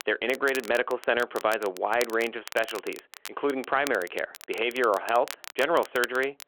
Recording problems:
phone-call audio
crackle, like an old record; noticeable; 15 dB below the speech

